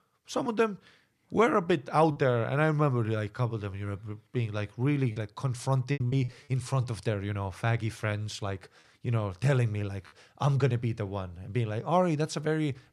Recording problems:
choppy; occasionally; at 2 s, from 5 to 6.5 s and at 10 s; 4% of the speech affected

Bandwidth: 14.5 kHz